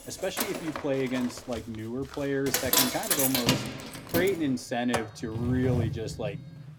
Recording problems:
household noises; very loud; throughout; 2 dB above the speech

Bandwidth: 17 kHz